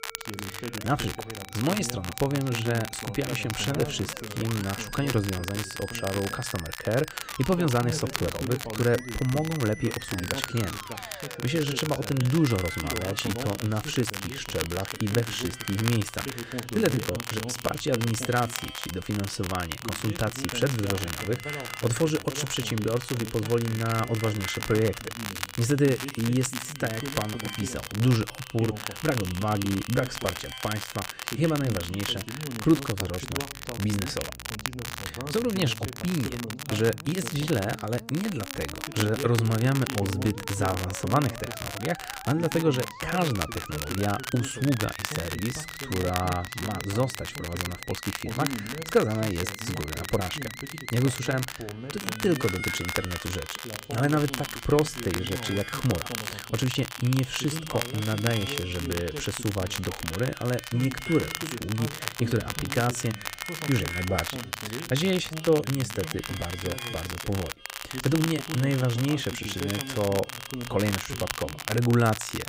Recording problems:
crackle, like an old record; loud; 7 dB below the speech
background music; noticeable; throughout; 15 dB below the speech
voice in the background; noticeable; throughout; 10 dB below the speech

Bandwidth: 15.5 kHz